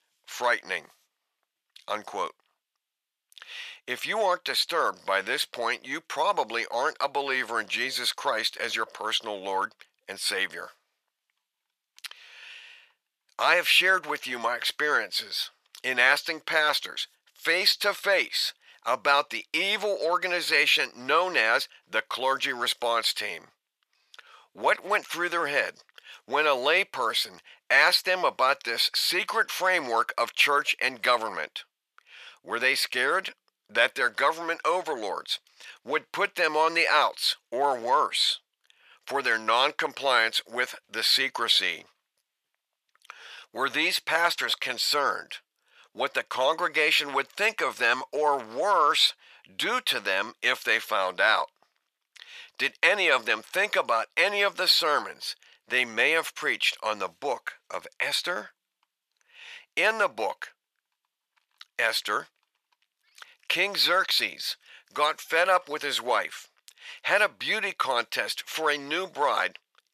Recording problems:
thin; very; fading below 900 Hz

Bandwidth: 14.5 kHz